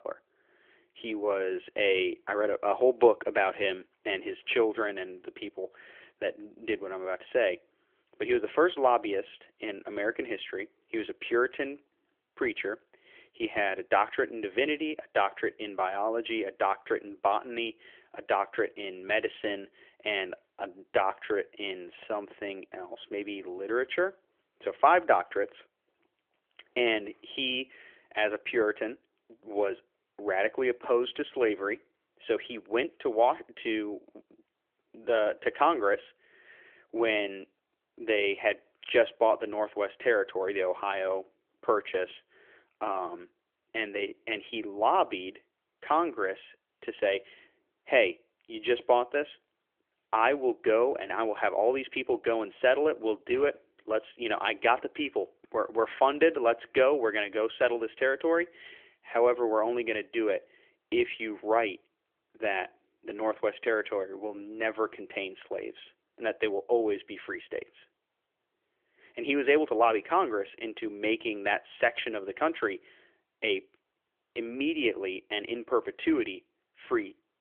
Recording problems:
phone-call audio; nothing above 3.5 kHz

